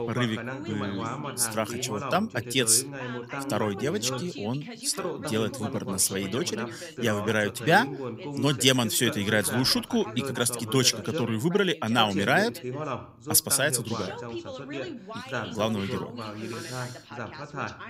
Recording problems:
background chatter; loud; throughout; 2 voices, 10 dB below the speech

